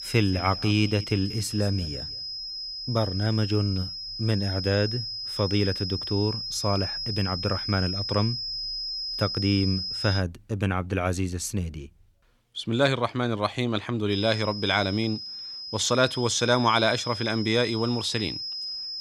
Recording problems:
high-pitched whine; loud; until 10 s and from 14 s on; 5 kHz, 5 dB below the speech

